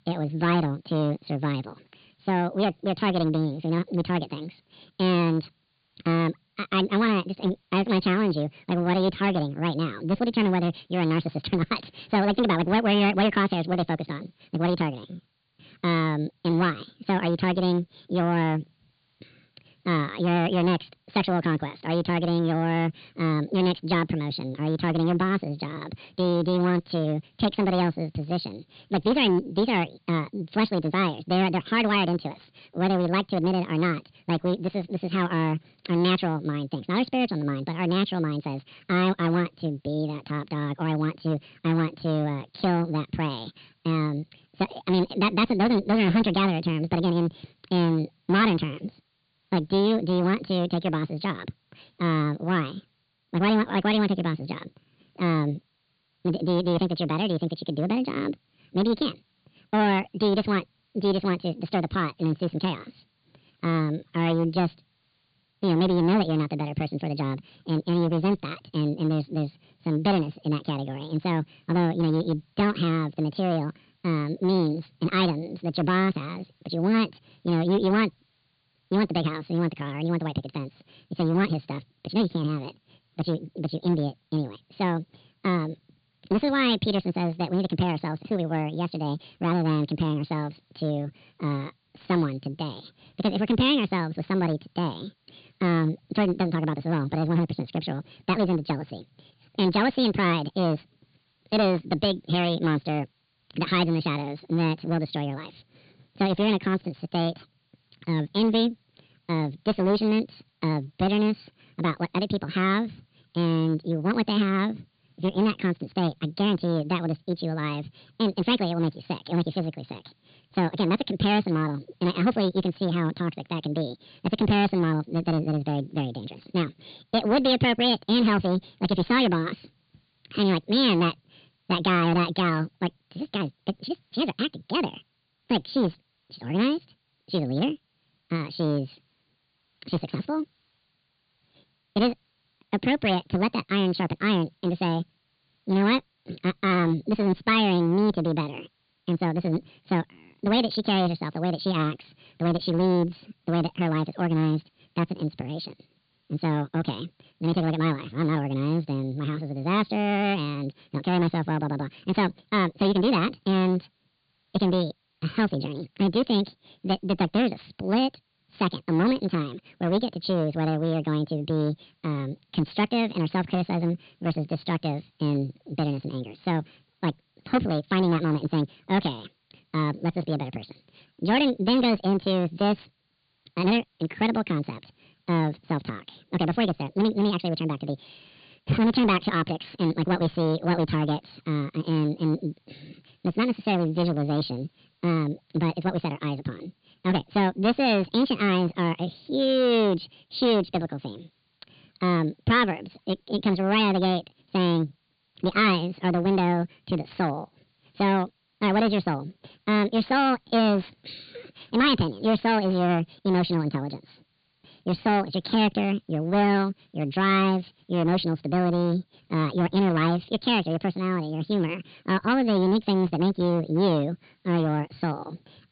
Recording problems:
high frequencies cut off; severe; nothing above 4.5 kHz
wrong speed and pitch; too fast and too high; 1.7 times normal speed
distortion; slight; 5% of the sound clipped
hiss; very faint; throughout; 45 dB below the speech

